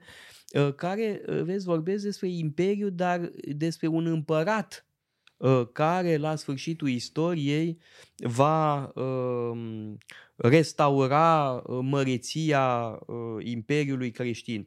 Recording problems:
none

